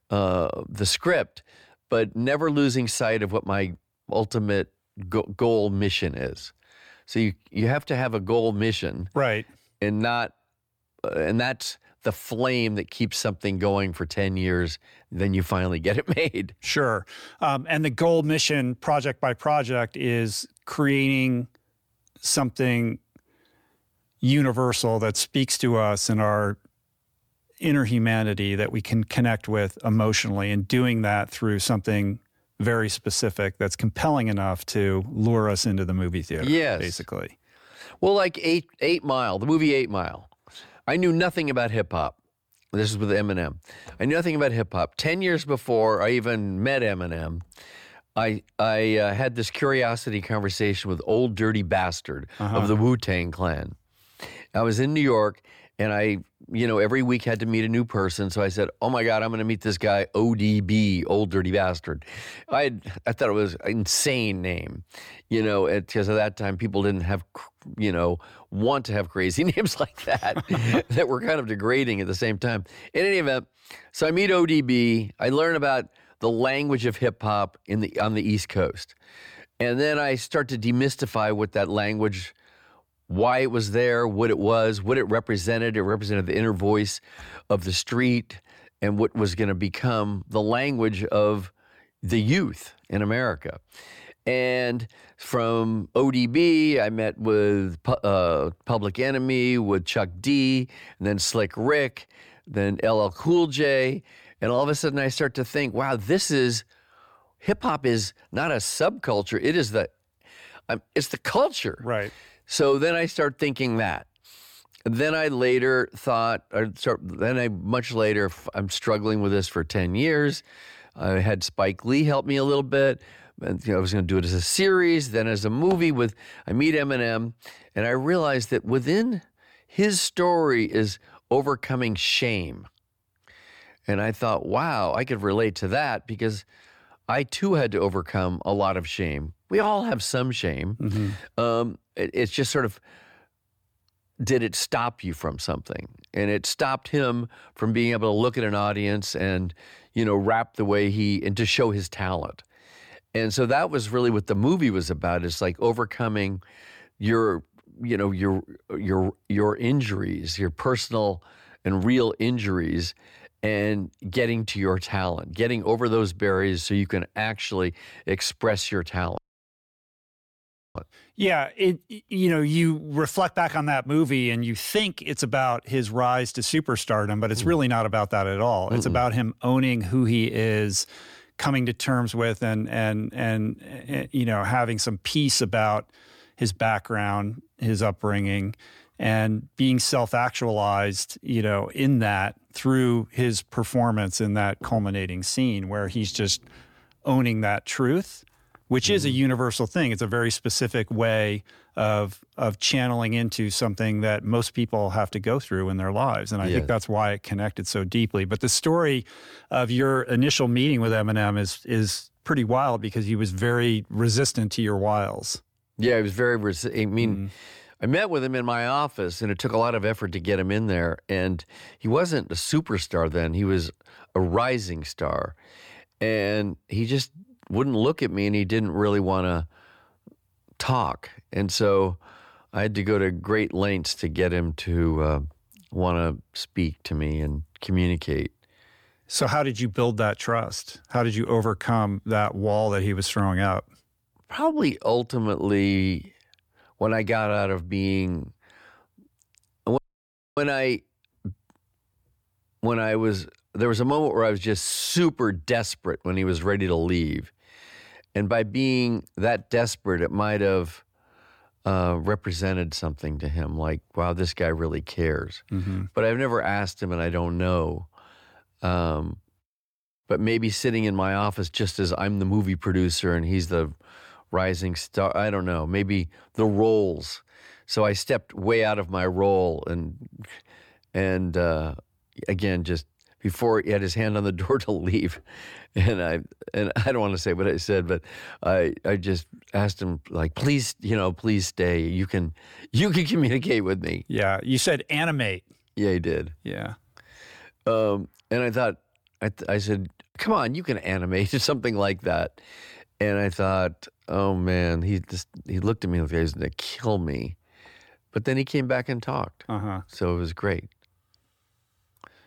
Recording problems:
audio cutting out; at 2:49 for 1.5 s and at 4:10 for 0.5 s

